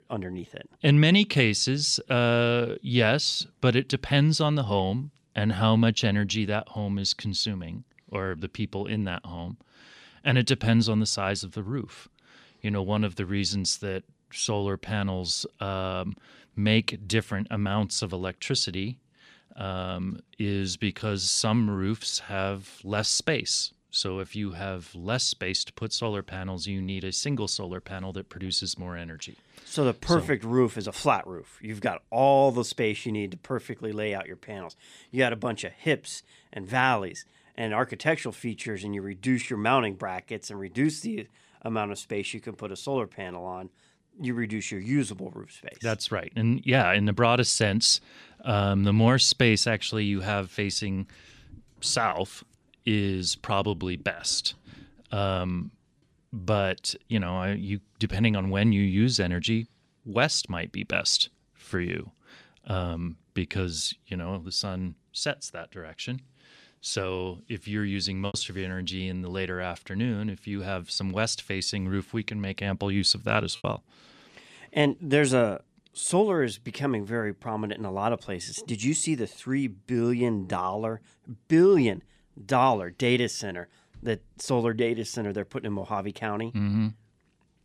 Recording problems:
choppy; occasionally; at 1:08 and at 1:14; 3% of the speech affected

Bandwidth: 14.5 kHz